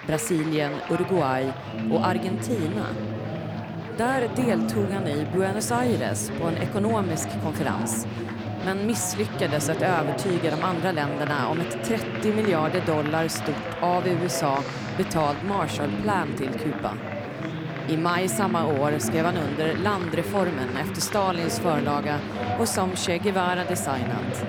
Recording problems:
chatter from many people; loud; throughout; 4 dB below the speech

